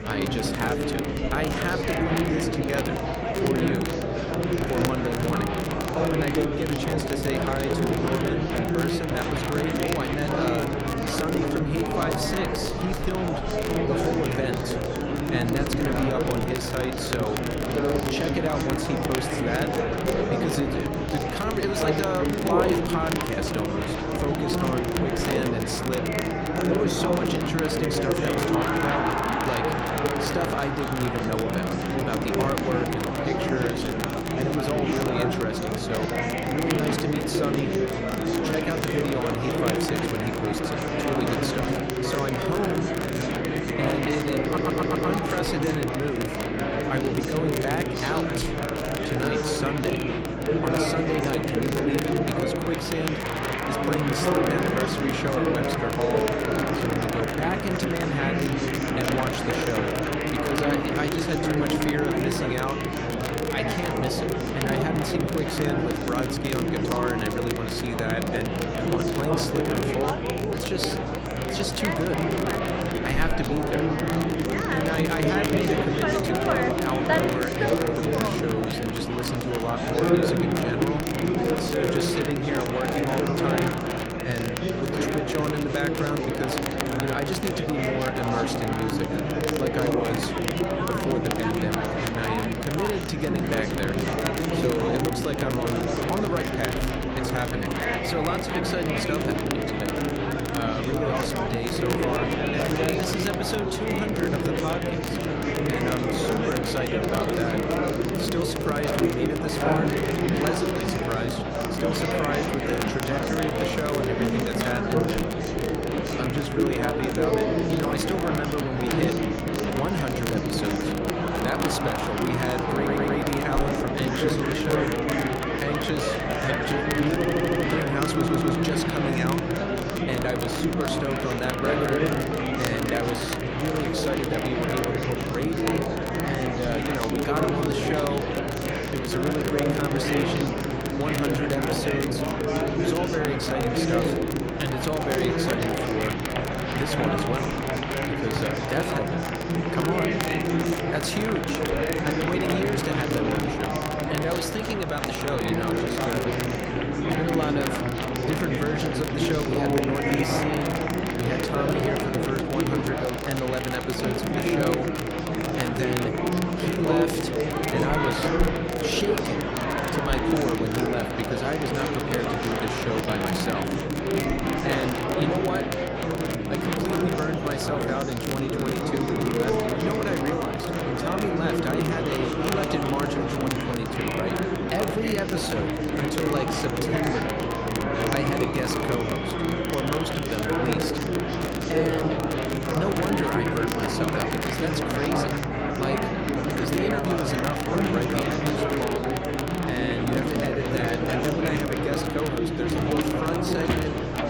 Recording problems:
murmuring crowd; very loud; throughout; 4 dB above the speech
crackle, like an old record; loud; 8 dB below the speech
electrical hum; noticeable; throughout; 60 Hz, 20 dB below the speech
audio stuttering; 4 times, first at 44 s

